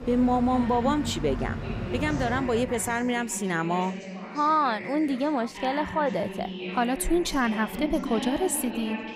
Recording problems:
traffic noise; loud; until 2.5 s; 9 dB below the speech
background chatter; loud; throughout; 4 voices, 9 dB below the speech

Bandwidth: 15.5 kHz